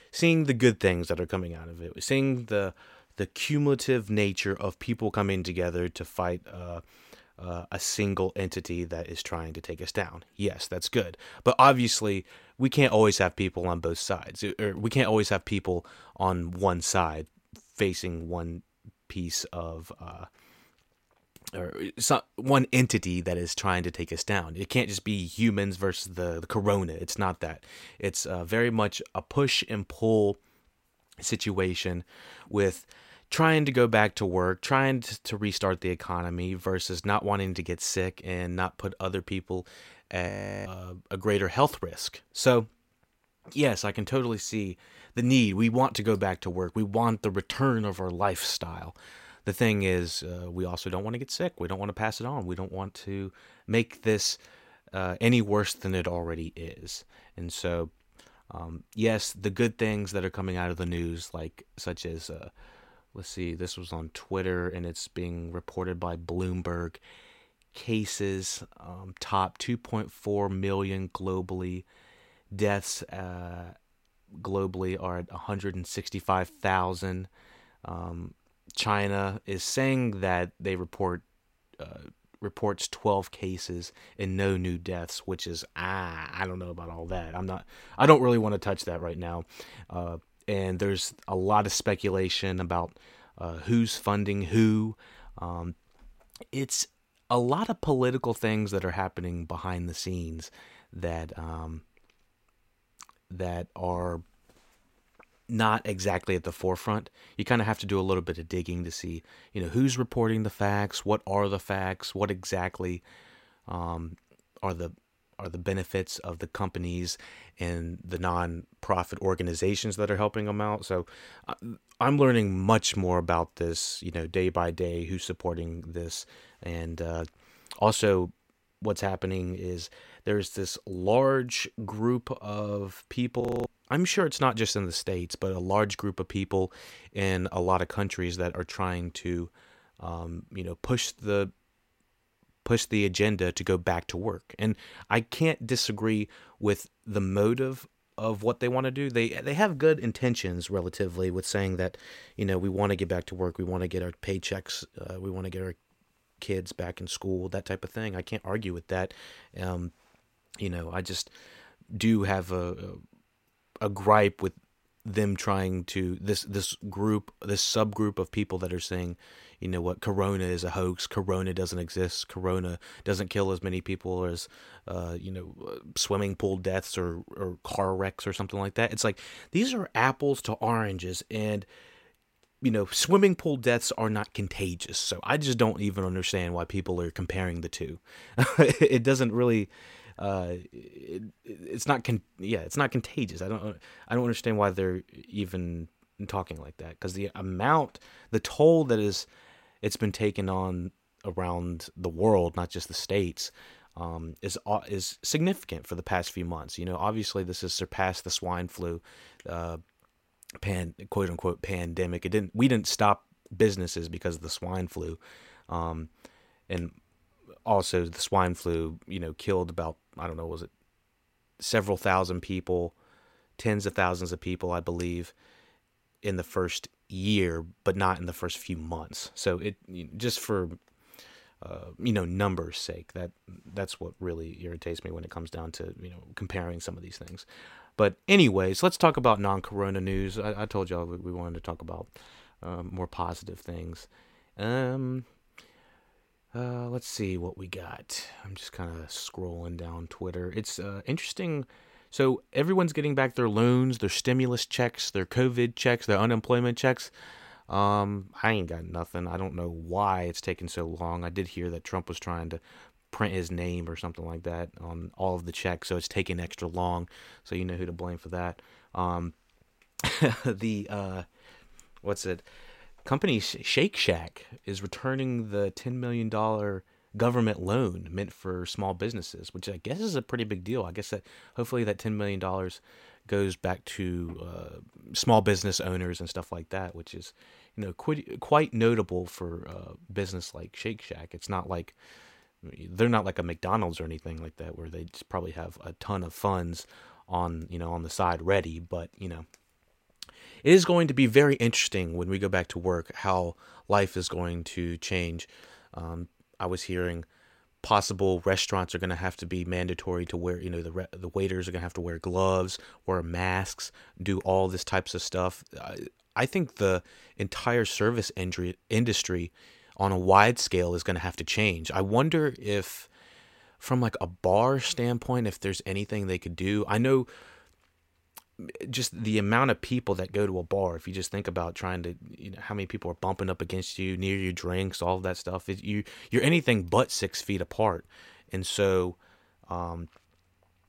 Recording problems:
audio freezing; at 40 s and at 2:13

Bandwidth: 16 kHz